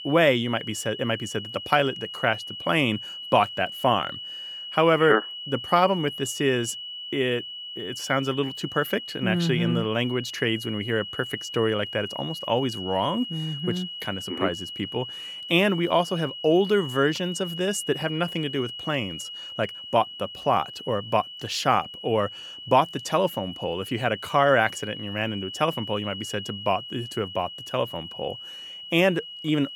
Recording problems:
high-pitched whine; loud; throughout; 3 kHz, 9 dB below the speech

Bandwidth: 18.5 kHz